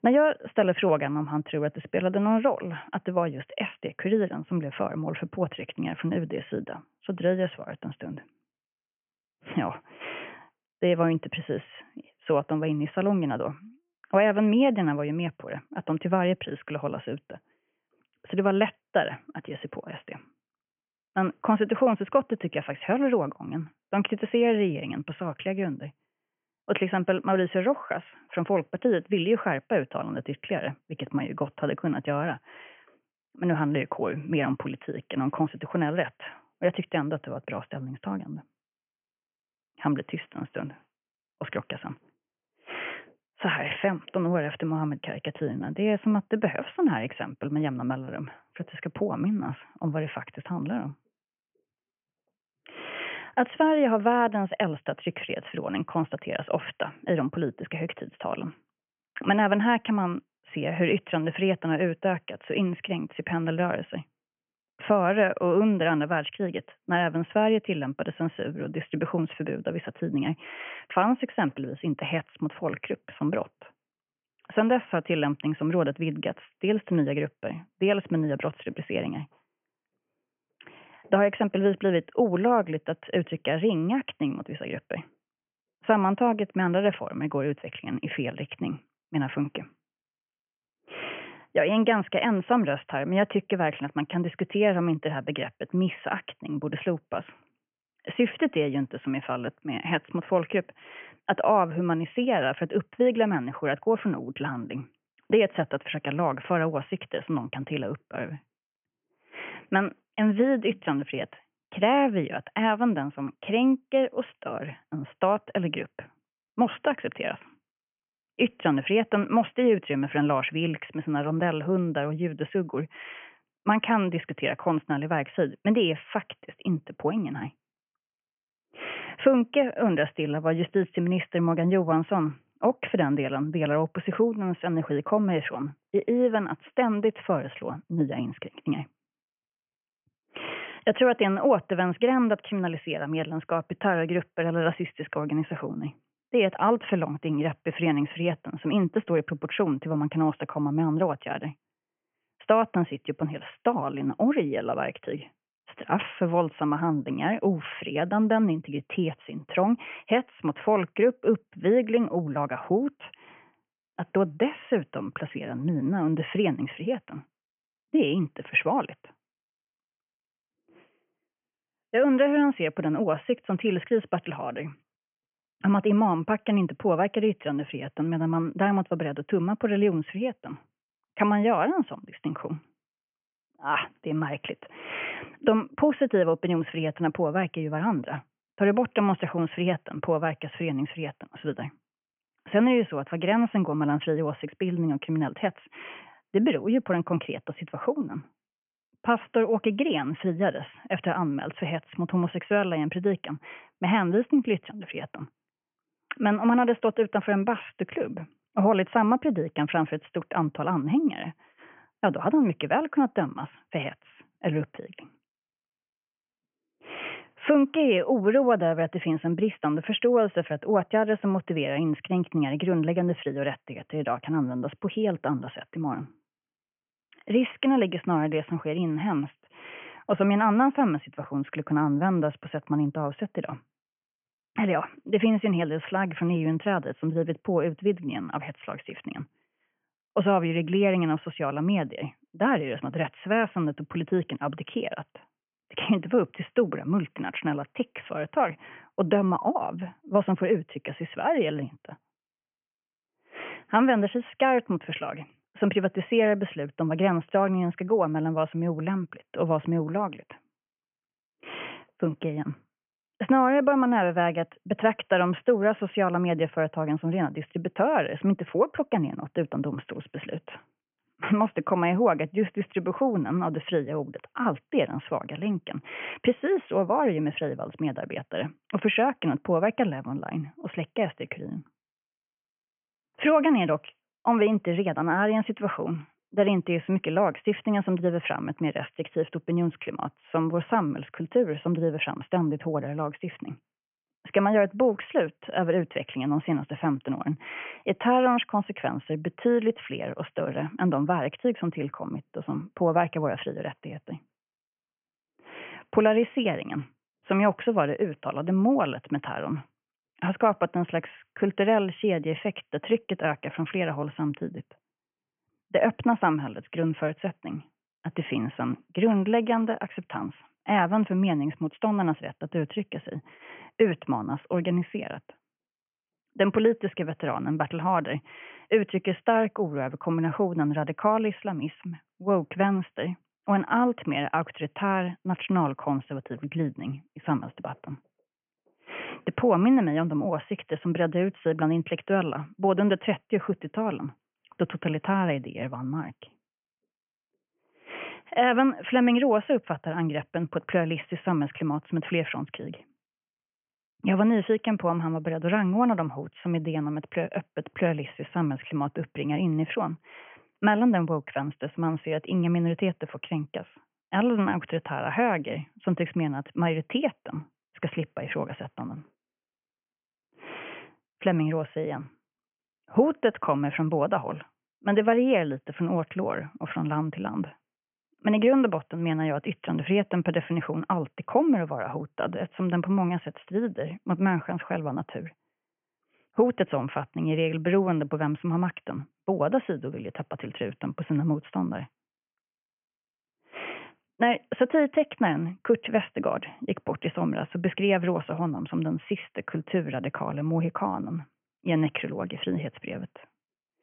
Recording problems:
high frequencies cut off; severe; nothing above 3 kHz

